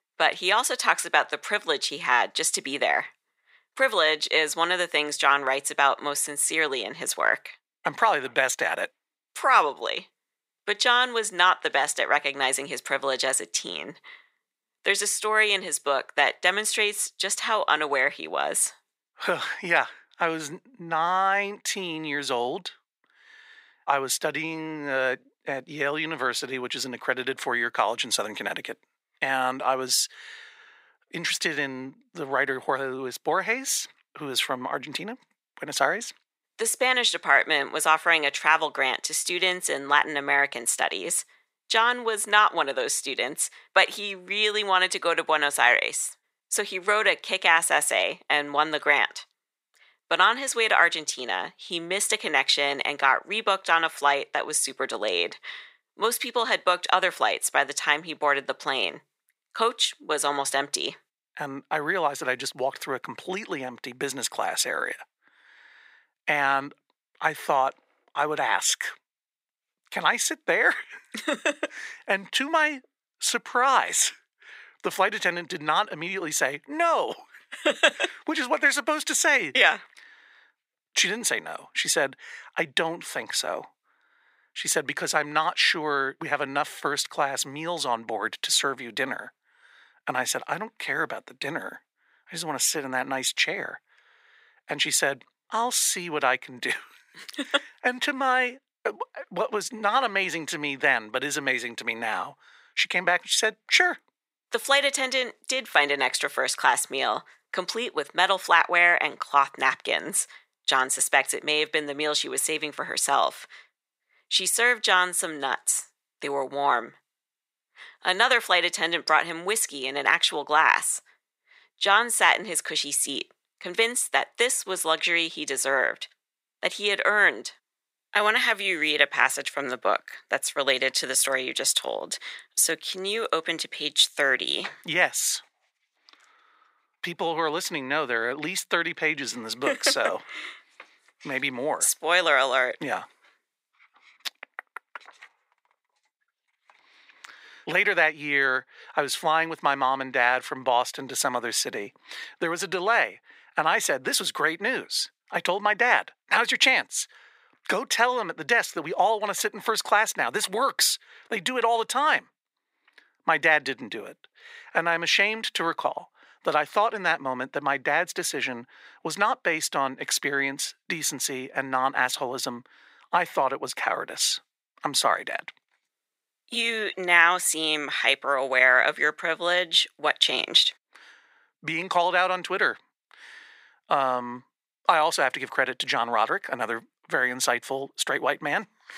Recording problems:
thin; very; fading below 600 Hz

